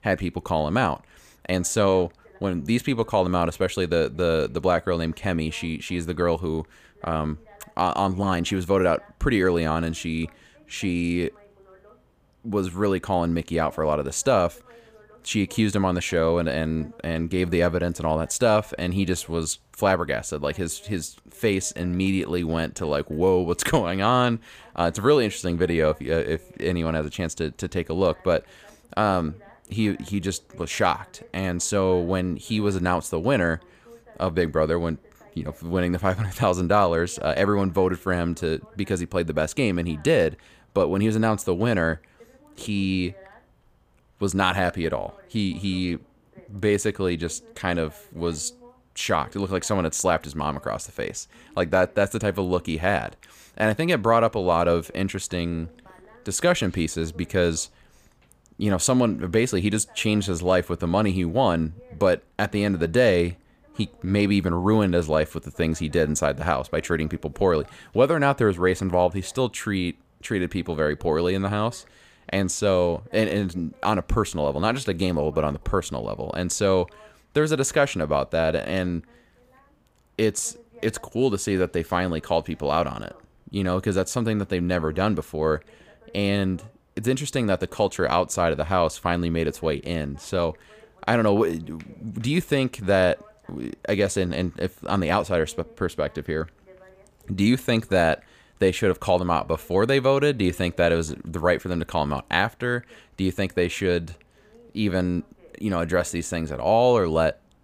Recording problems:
voice in the background; faint; throughout; 30 dB below the speech

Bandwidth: 15 kHz